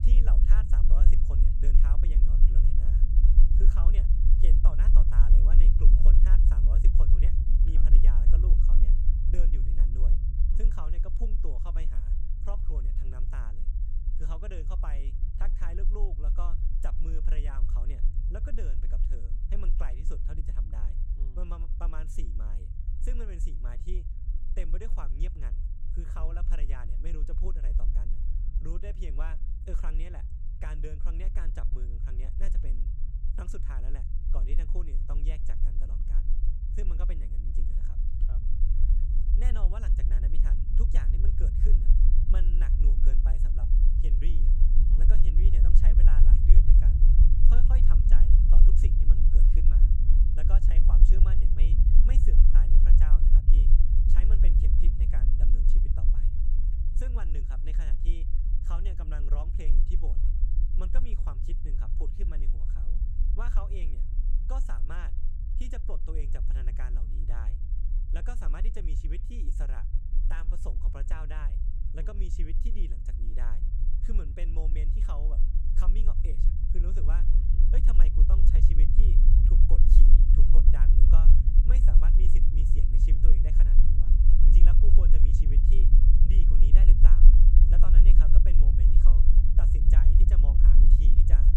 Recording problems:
low rumble; loud; throughout; as loud as the speech

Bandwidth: 16.5 kHz